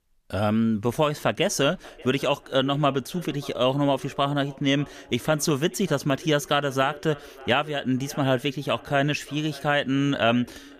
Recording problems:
echo of what is said; faint; throughout; 590 ms later, 20 dB below the speech

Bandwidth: 14.5 kHz